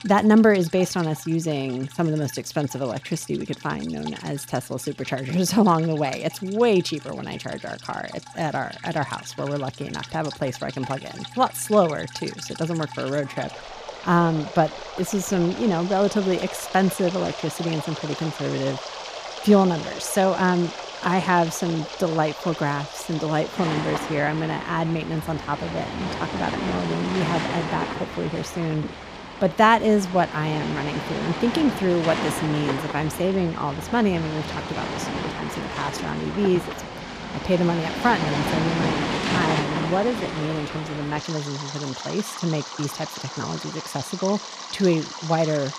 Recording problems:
rain or running water; loud; throughout; 7 dB below the speech

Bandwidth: 14.5 kHz